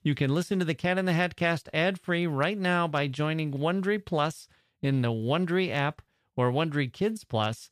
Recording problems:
none

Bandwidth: 14.5 kHz